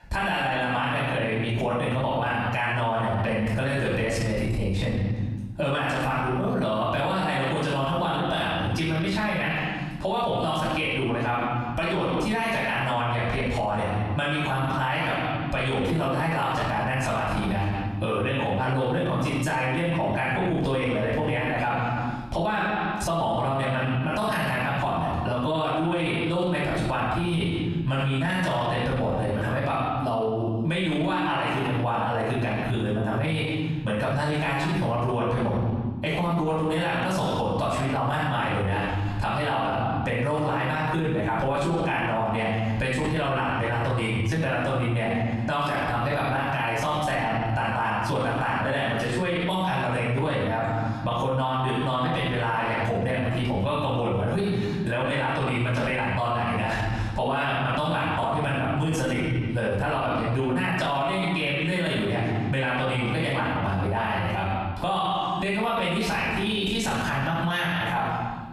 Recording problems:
off-mic speech; far
room echo; noticeable; dies away in 1 s
squashed, flat; somewhat

